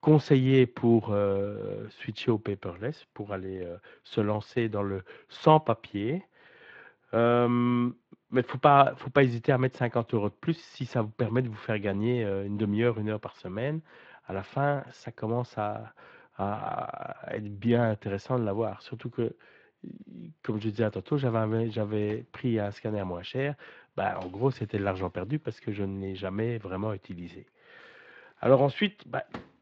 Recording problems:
muffled; very; fading above 2.5 kHz
garbled, watery; slightly
household noises; faint; throughout; 25 dB below the speech

